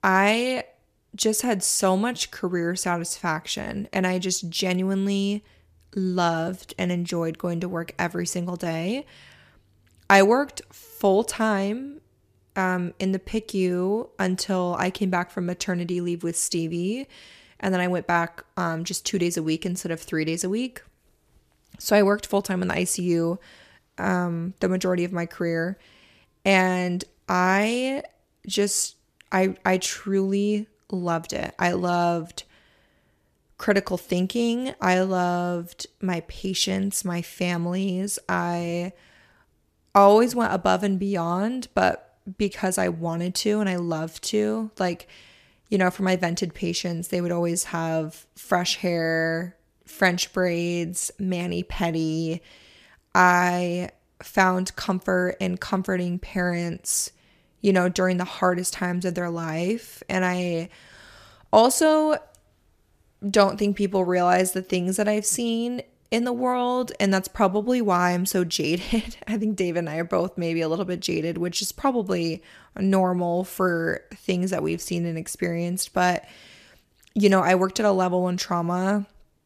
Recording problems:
none

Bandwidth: 14.5 kHz